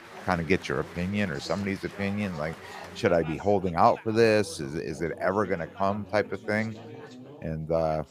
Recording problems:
chatter from many people; noticeable; throughout; 15 dB below the speech

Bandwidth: 15 kHz